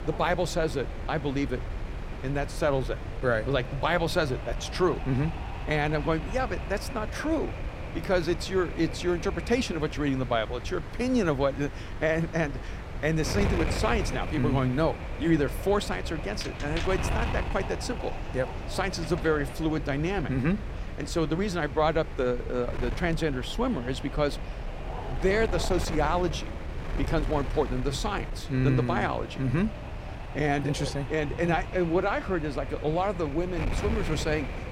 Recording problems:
wind noise on the microphone; heavy; 10 dB below the speech

